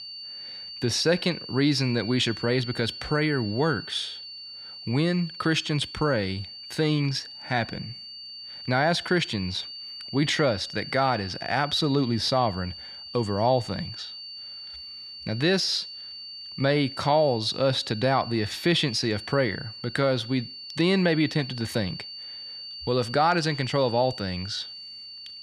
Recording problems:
high-pitched whine; noticeable; throughout; 4.5 kHz, 10 dB below the speech

